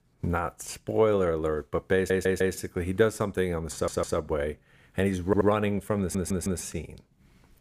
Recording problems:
audio stuttering; 4 times, first at 2 s

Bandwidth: 15 kHz